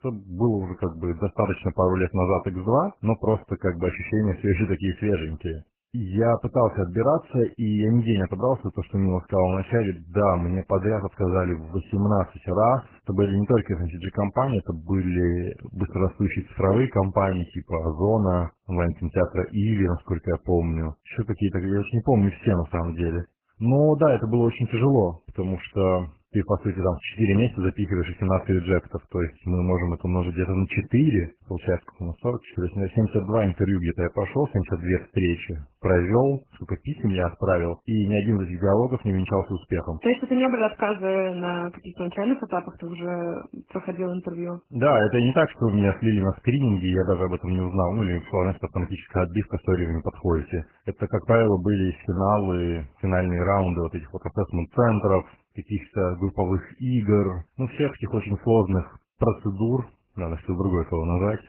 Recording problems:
garbled, watery; badly; nothing above 3 kHz

